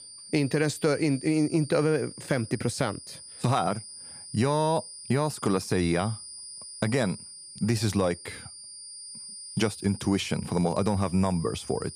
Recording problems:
high-pitched whine; noticeable; throughout; 9.5 kHz, 15 dB below the speech

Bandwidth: 15 kHz